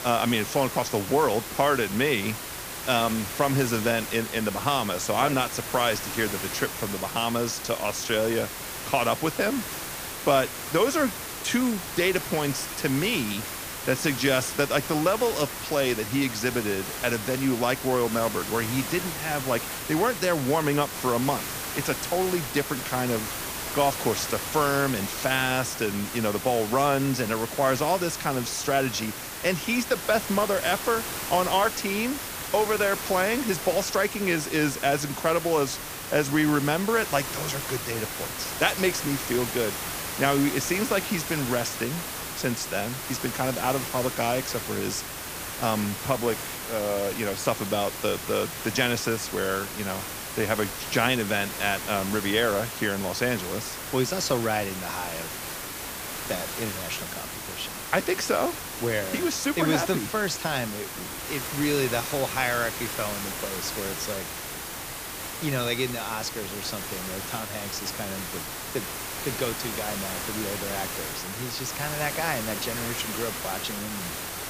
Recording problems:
hiss; loud; throughout; 5 dB below the speech

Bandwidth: 15 kHz